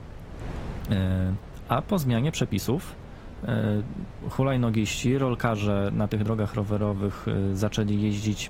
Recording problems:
garbled, watery; slightly; nothing above 15.5 kHz
wind noise on the microphone; occasional gusts; 15 dB below the speech
uneven, jittery; strongly; from 1 to 7 s

